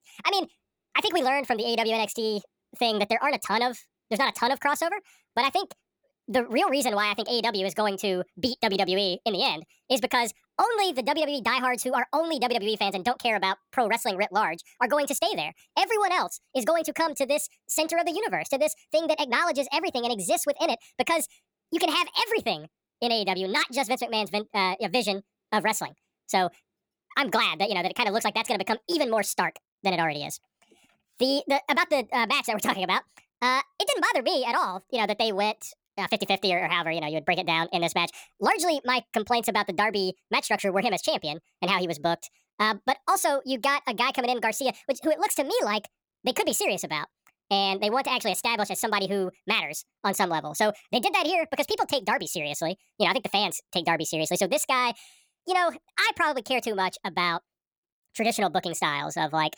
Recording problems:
wrong speed and pitch; too fast and too high; 1.5 times normal speed

